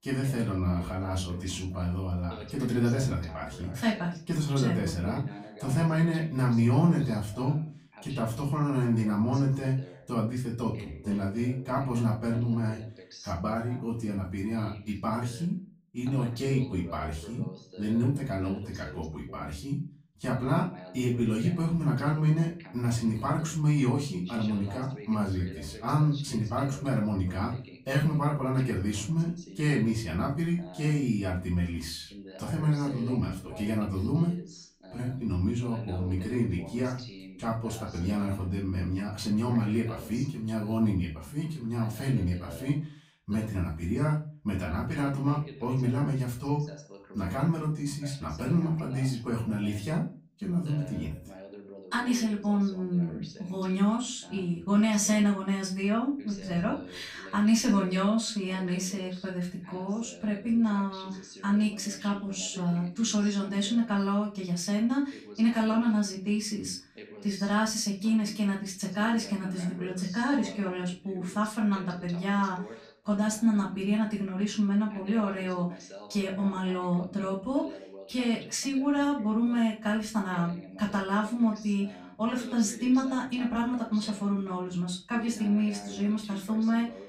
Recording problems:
off-mic speech; far
room echo; slight; dies away in 0.3 s
voice in the background; noticeable; throughout; 20 dB below the speech

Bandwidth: 15.5 kHz